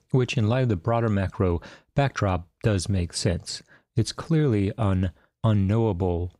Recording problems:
none

